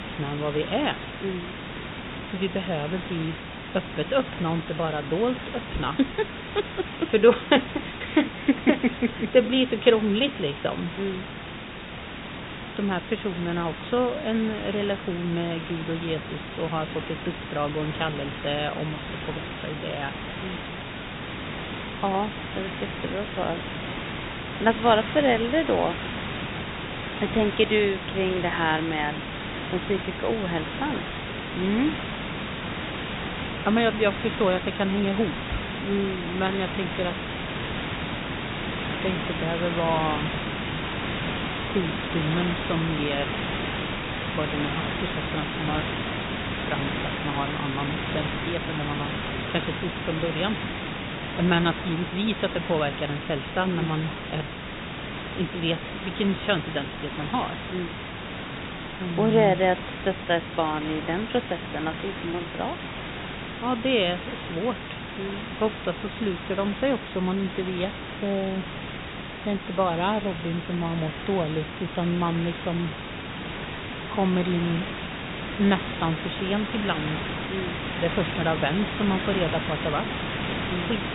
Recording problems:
high frequencies cut off; severe; nothing above 4 kHz
hiss; loud; throughout; 5 dB below the speech

